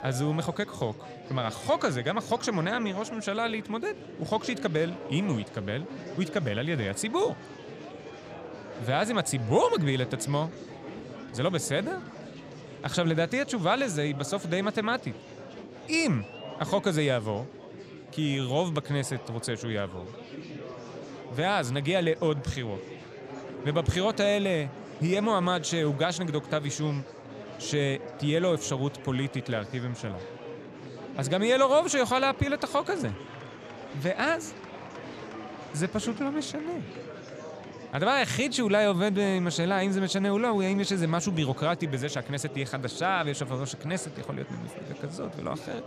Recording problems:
murmuring crowd; noticeable; throughout; 15 dB below the speech

